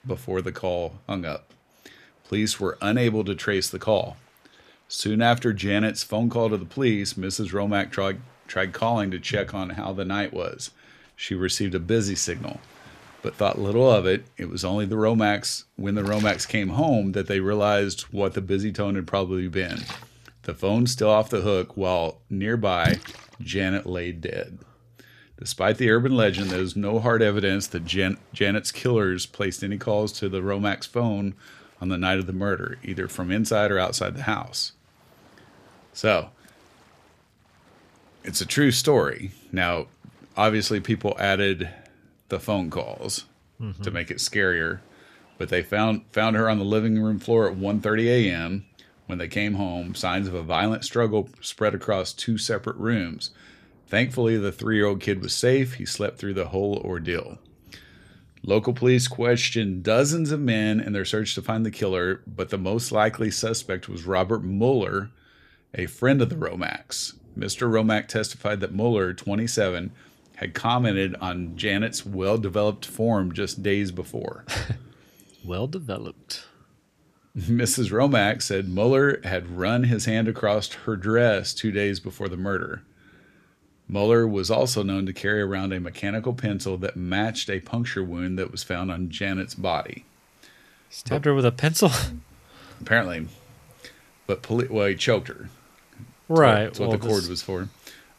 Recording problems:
rain or running water; faint; throughout; 20 dB below the speech

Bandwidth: 14.5 kHz